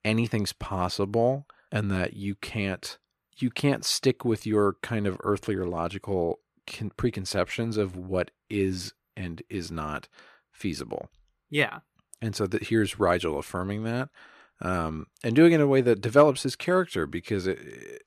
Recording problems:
none

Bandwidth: 14 kHz